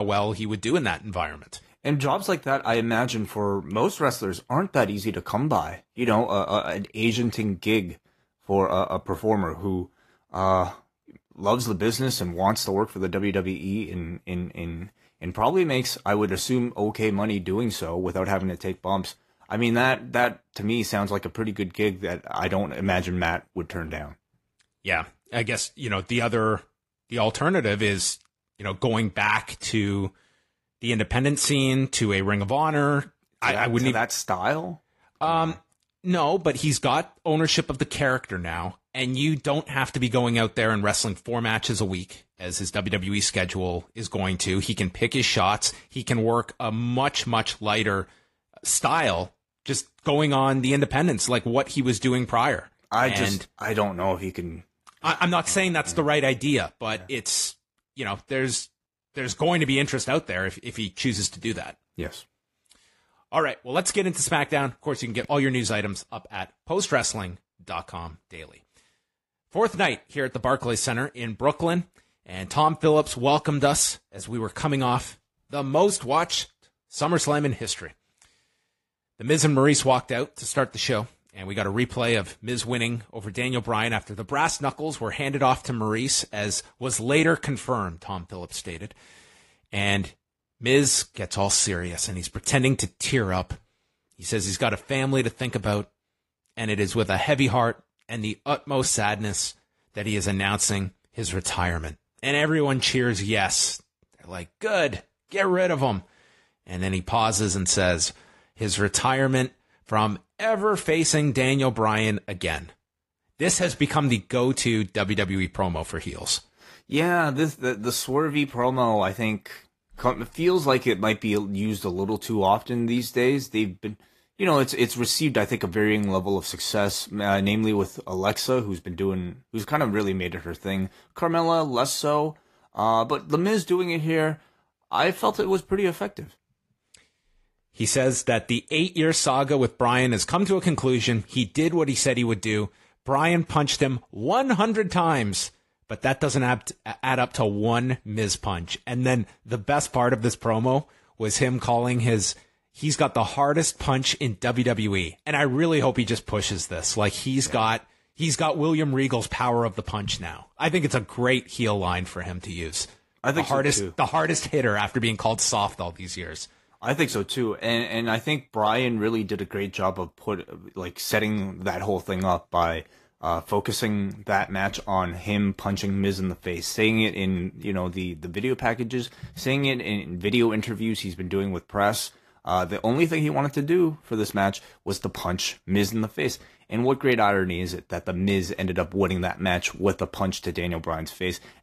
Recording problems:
garbled, watery; slightly
abrupt cut into speech; at the start

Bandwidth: 14.5 kHz